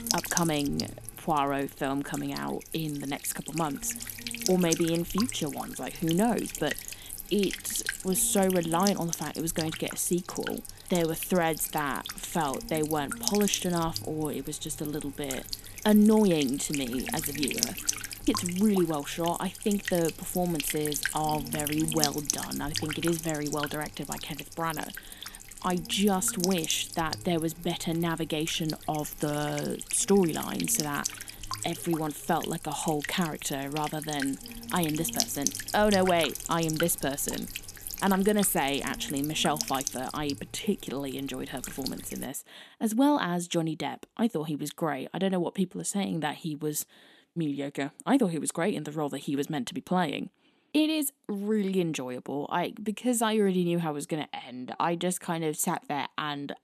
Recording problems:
electrical hum; loud; until 42 s; 60 Hz, 6 dB below the speech

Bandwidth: 13.5 kHz